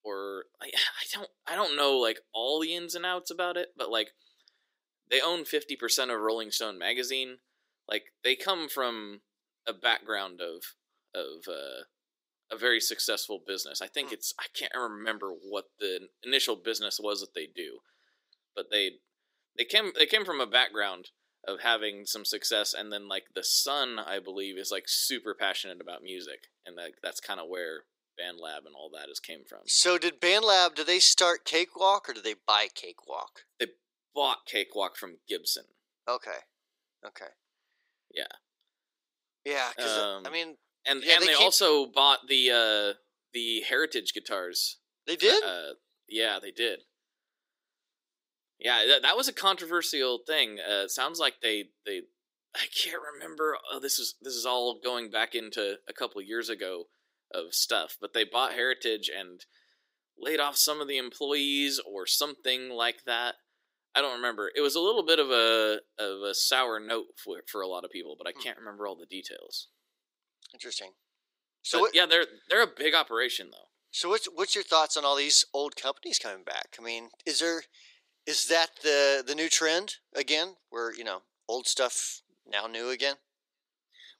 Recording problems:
thin; somewhat; fading below 350 Hz

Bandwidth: 15.5 kHz